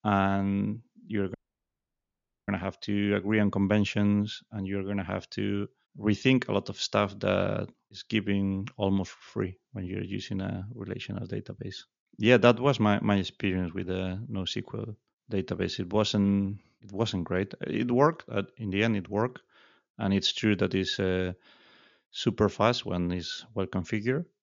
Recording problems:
high frequencies cut off; noticeable; nothing above 7 kHz
audio cutting out; at 1.5 s for 1 s

